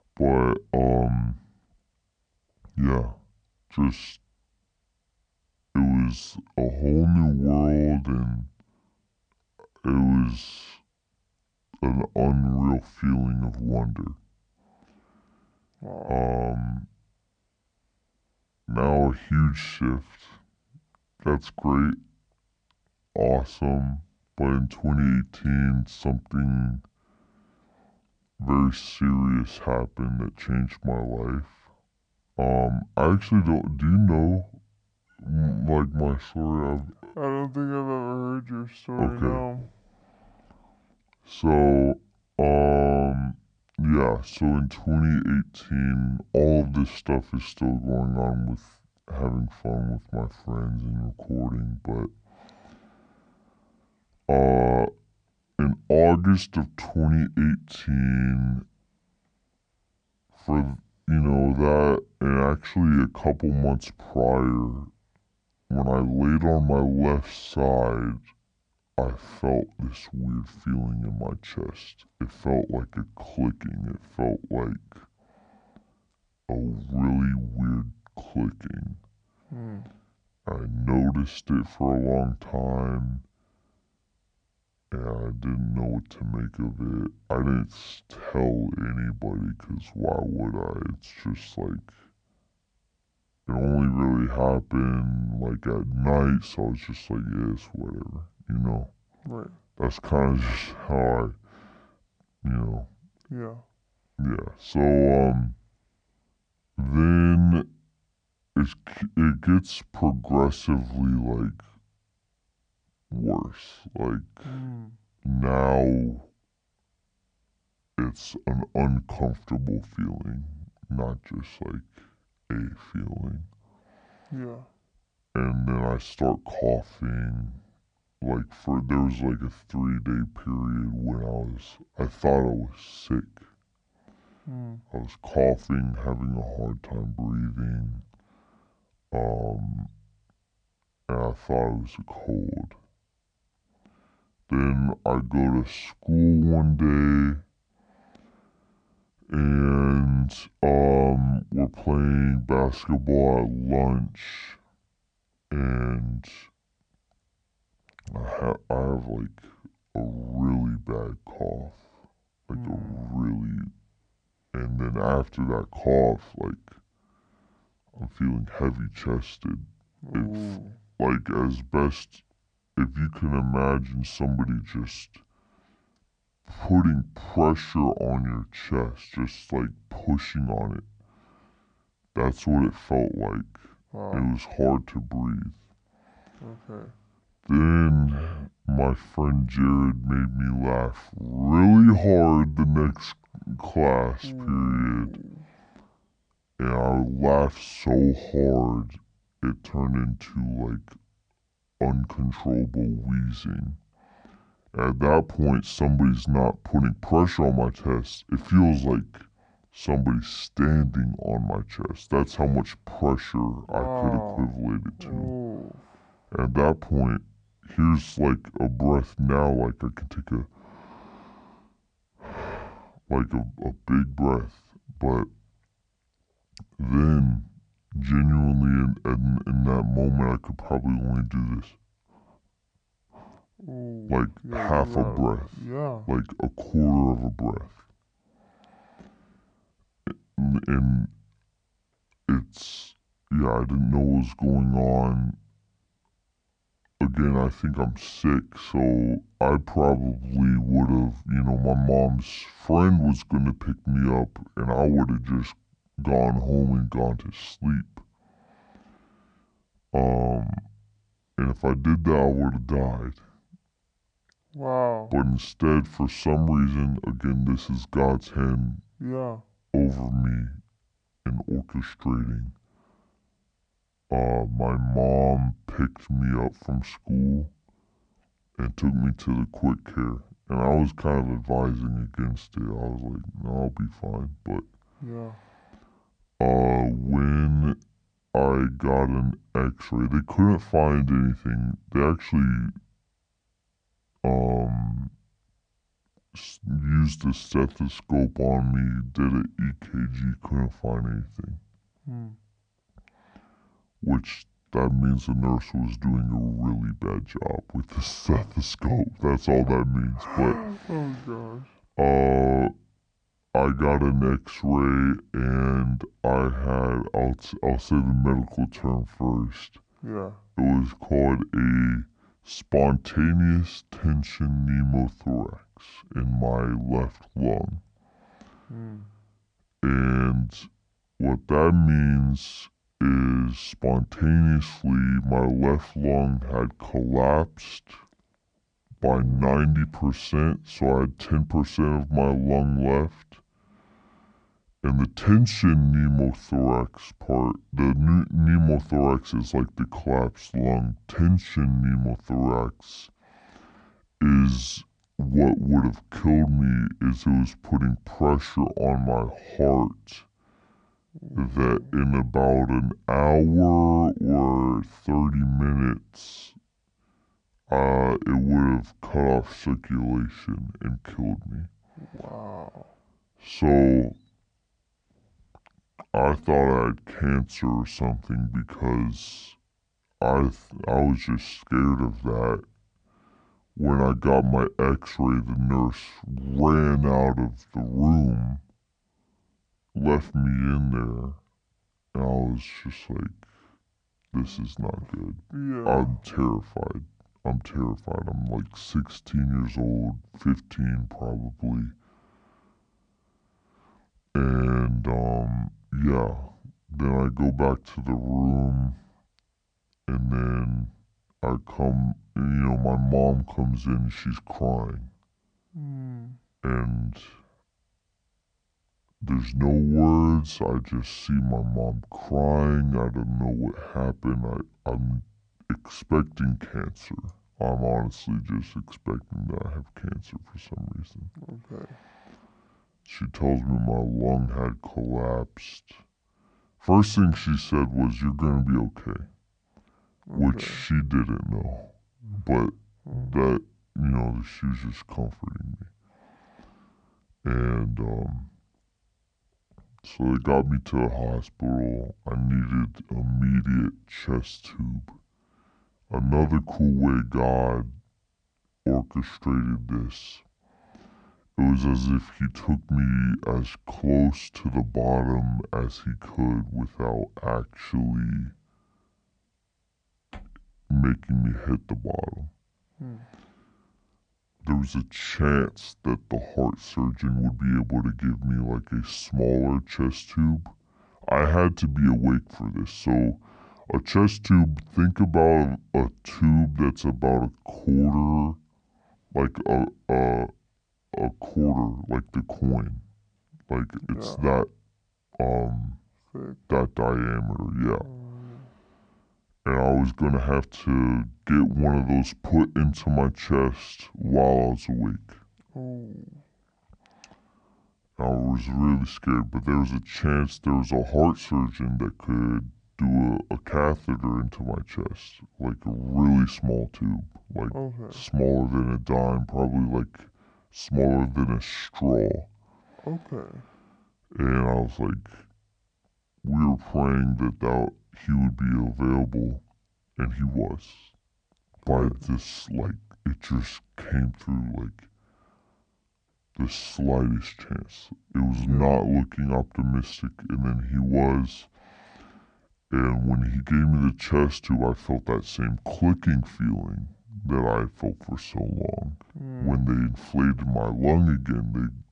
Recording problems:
wrong speed and pitch; too slow and too low; 0.7 times normal speed

